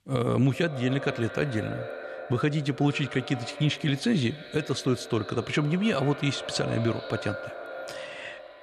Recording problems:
echo of what is said; strong; throughout; 120 ms later, 10 dB below the speech

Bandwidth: 13.5 kHz